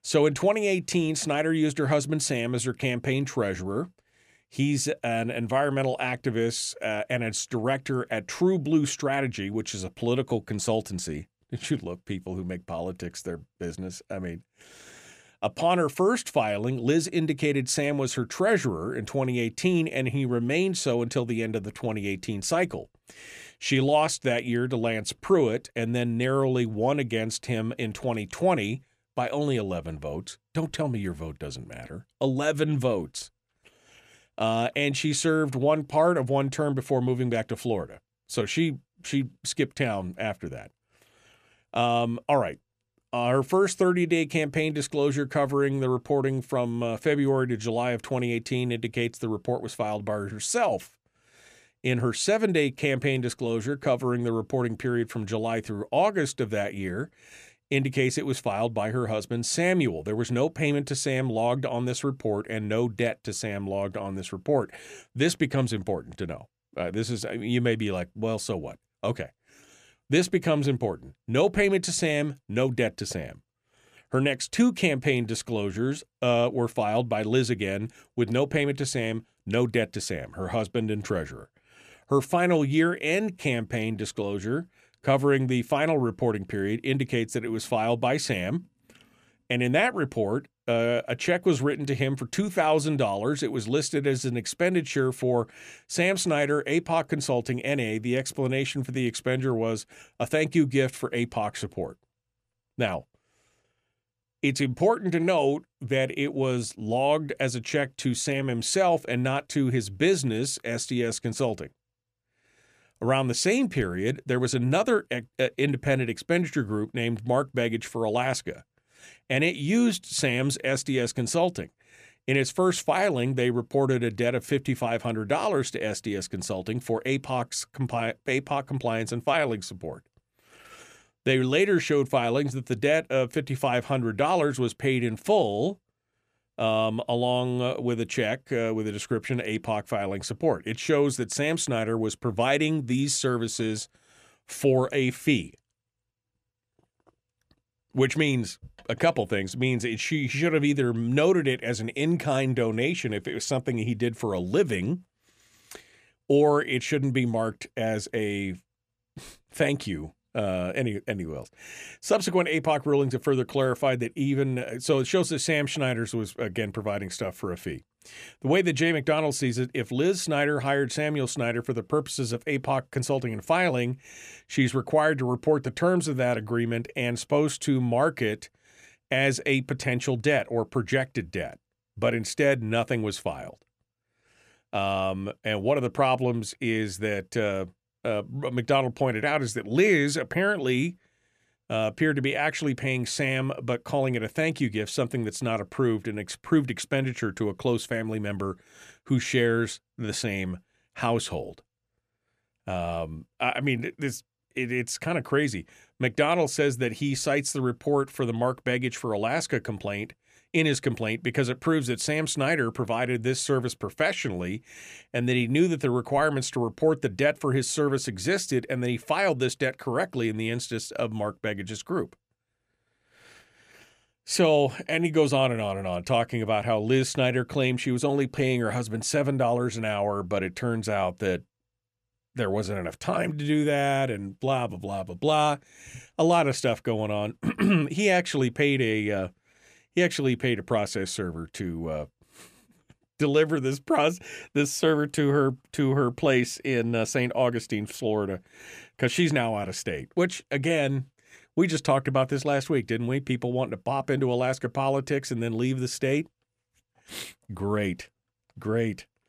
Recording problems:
none

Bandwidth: 14.5 kHz